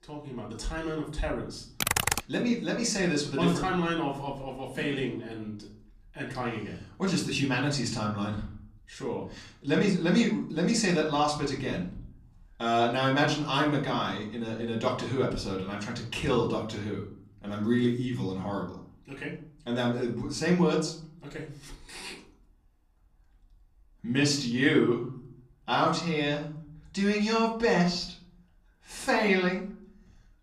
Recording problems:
off-mic speech; far
room echo; slight; dies away in 0.5 s
keyboard typing; loud; at 2 s; peak 3 dB above the speech

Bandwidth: 14.5 kHz